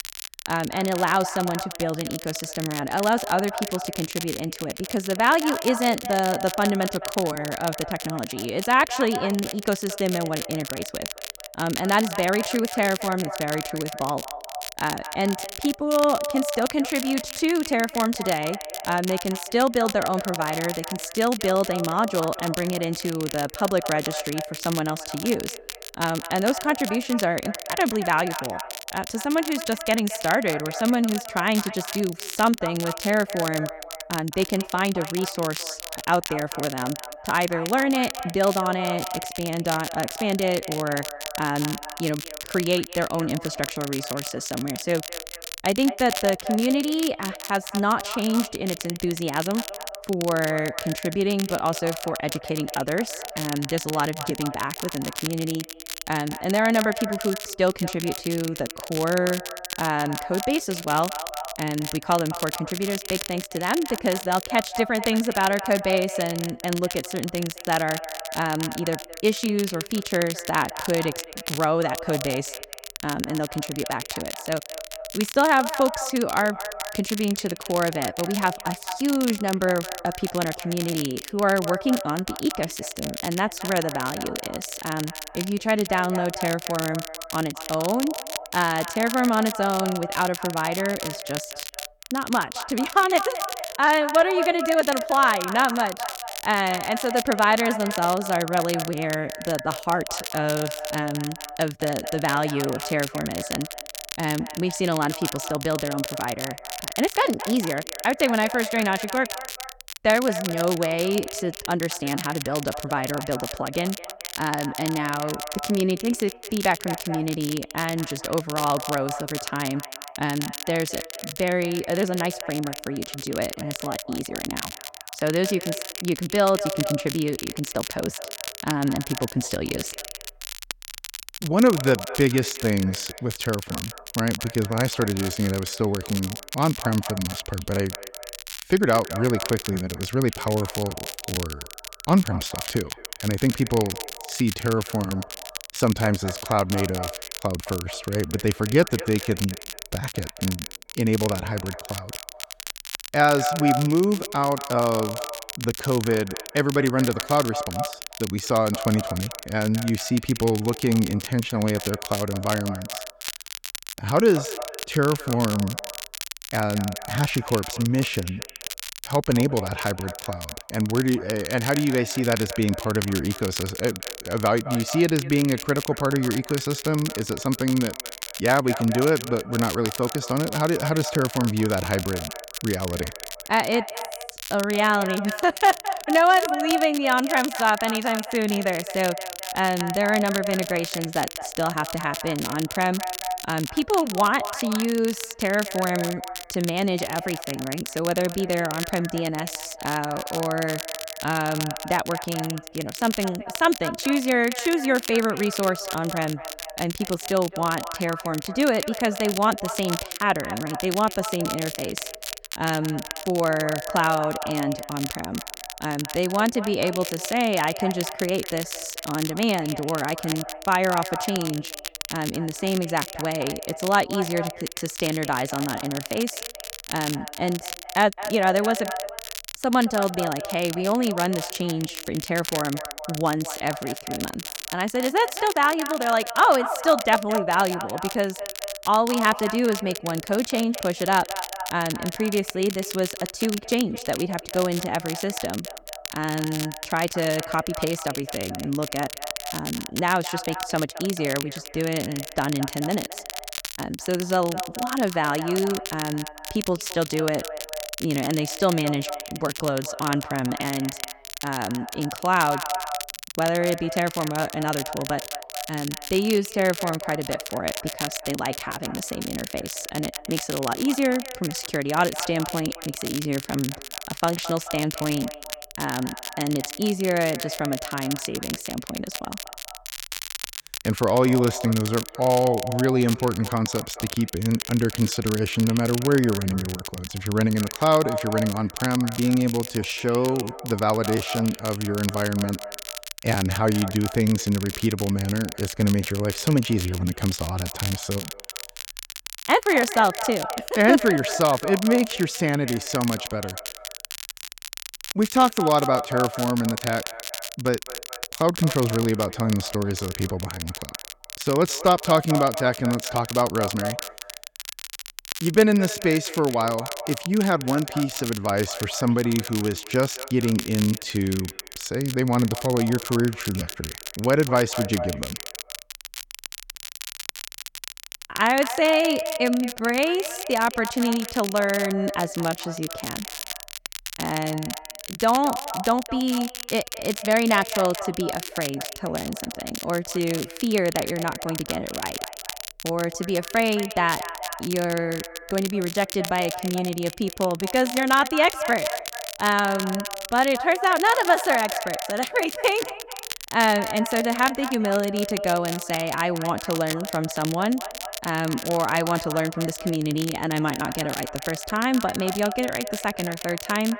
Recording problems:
echo of what is said; strong; throughout; 220 ms later, 10 dB below the speech
crackle, like an old record; loud; 9 dB below the speech

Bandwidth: 17.5 kHz